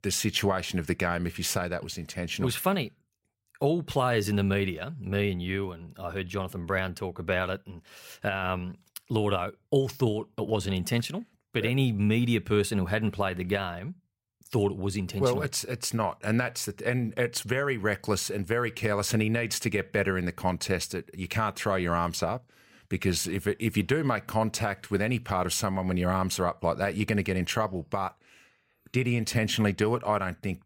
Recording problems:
none

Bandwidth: 16 kHz